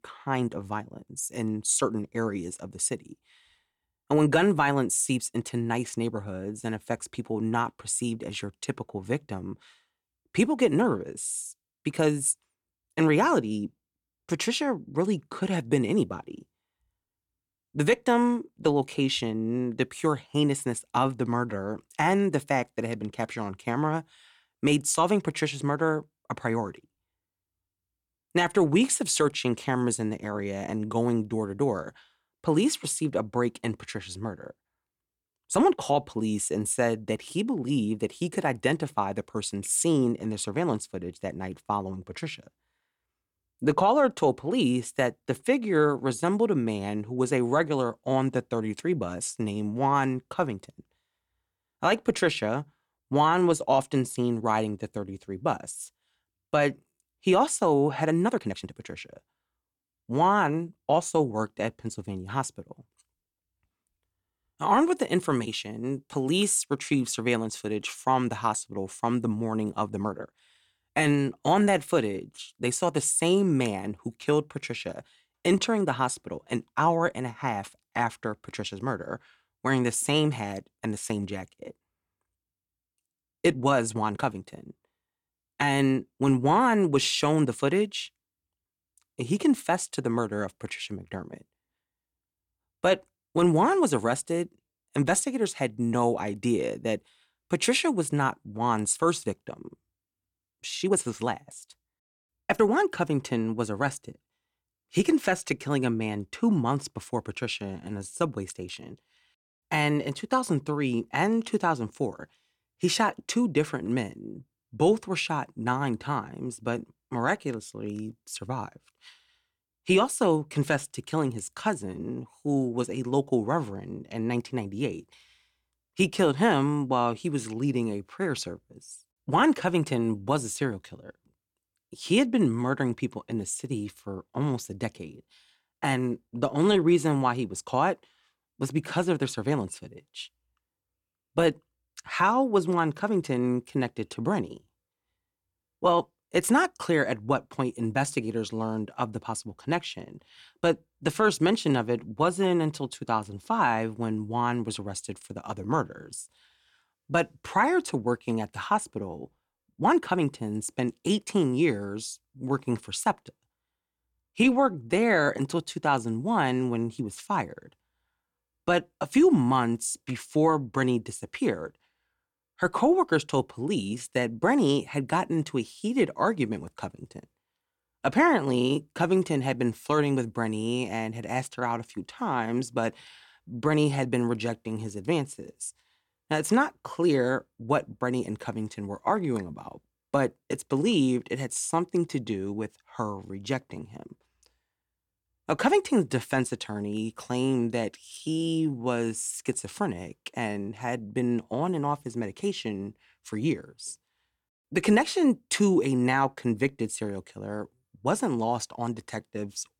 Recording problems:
uneven, jittery; strongly; from 35 s to 3:19

